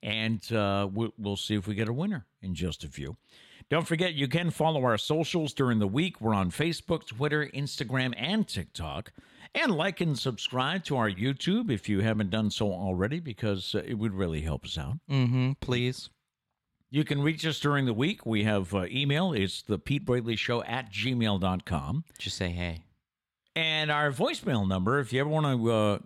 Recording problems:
none

